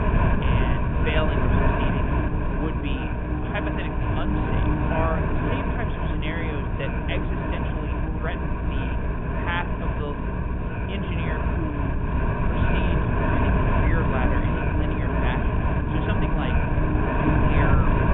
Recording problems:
high frequencies cut off; severe; nothing above 3.5 kHz
wind noise on the microphone; heavy; 4 dB above the speech
electrical hum; loud; throughout; 60 Hz, 5 dB below the speech

